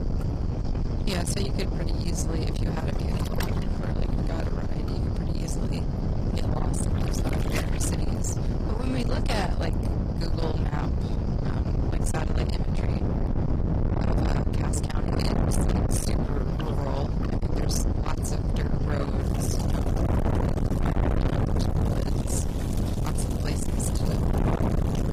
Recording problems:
distortion; heavy; 6 dB below the speech
garbled, watery; slightly; nothing above 15.5 kHz
wind noise on the microphone; heavy; as loud as the speech
rain or running water; loud; throughout; 10 dB below the speech

